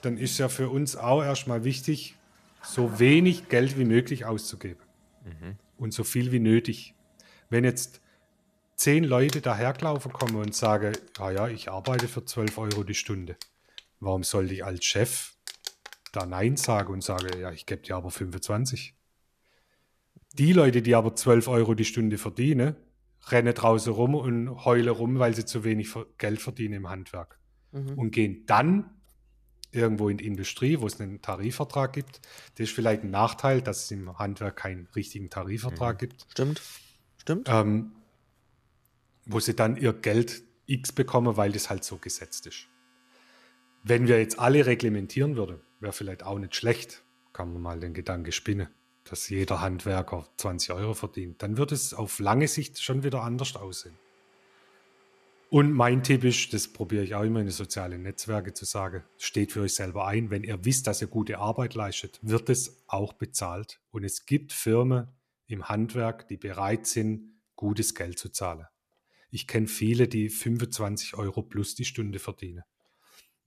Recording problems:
household noises; noticeable; throughout; 15 dB below the speech

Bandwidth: 14 kHz